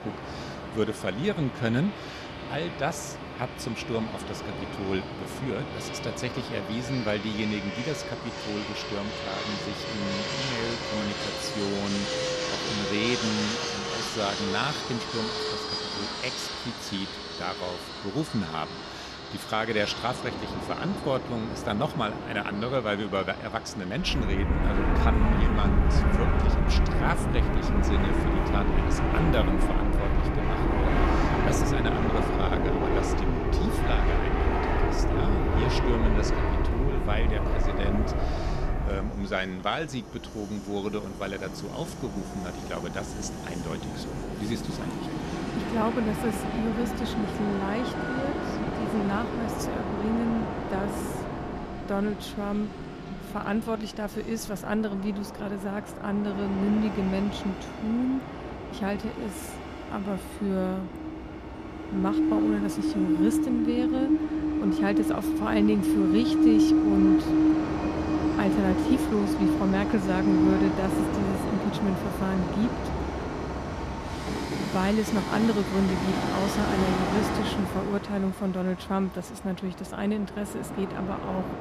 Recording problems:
train or aircraft noise; very loud; throughout; 2 dB above the speech

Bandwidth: 14 kHz